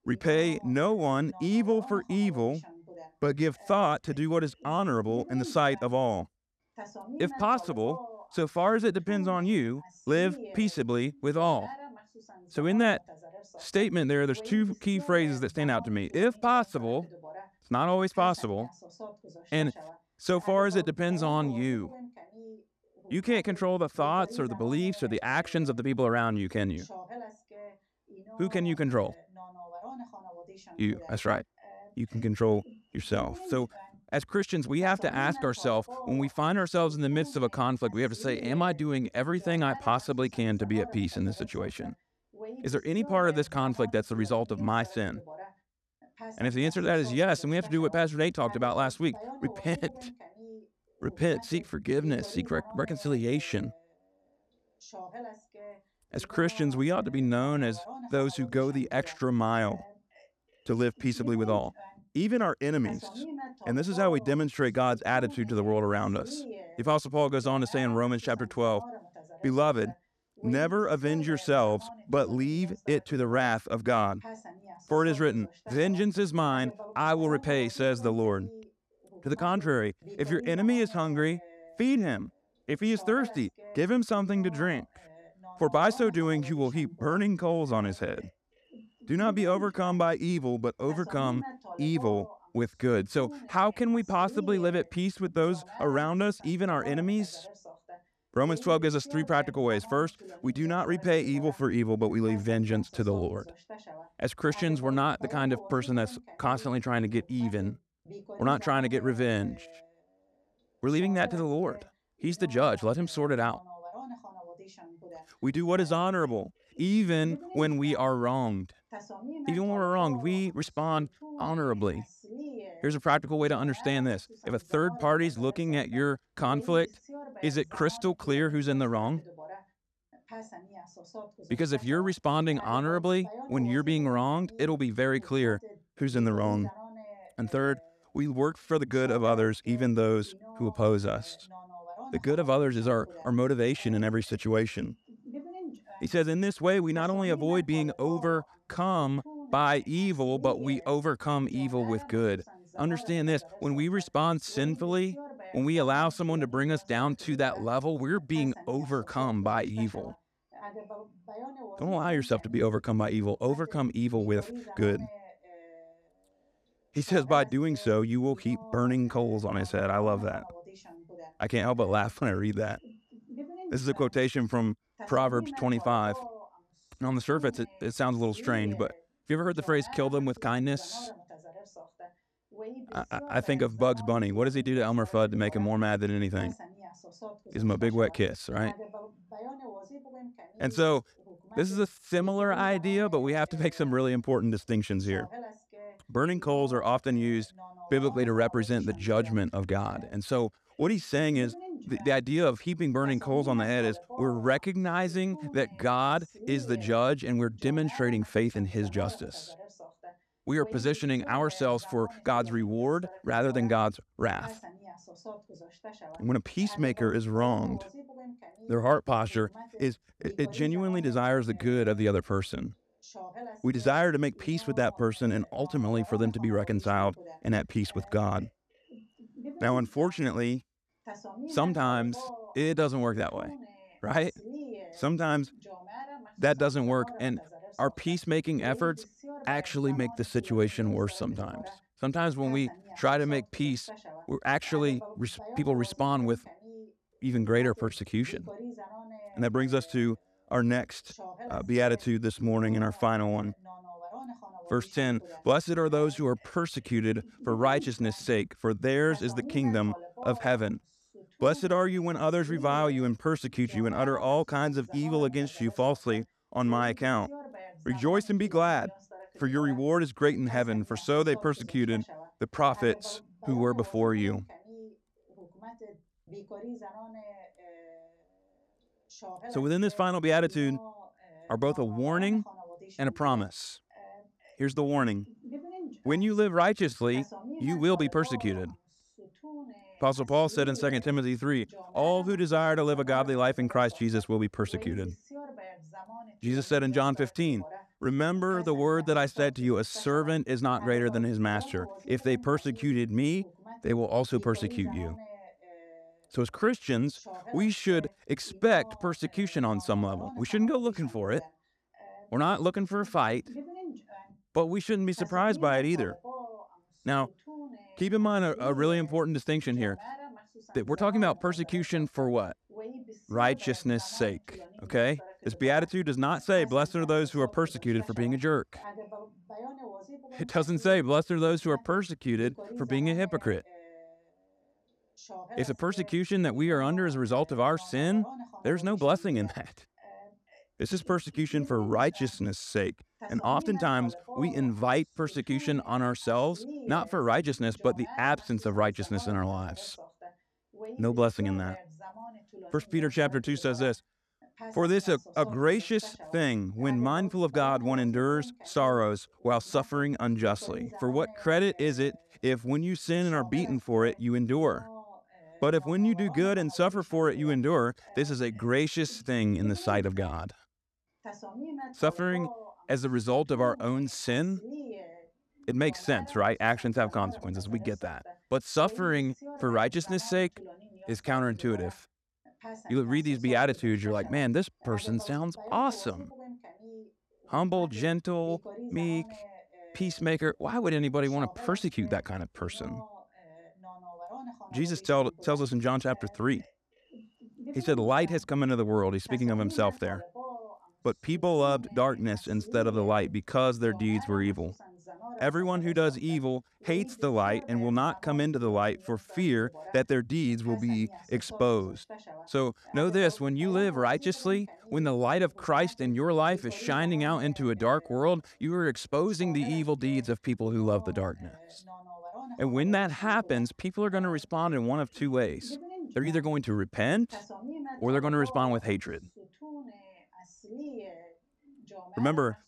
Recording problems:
voice in the background; noticeable; throughout; 20 dB below the speech

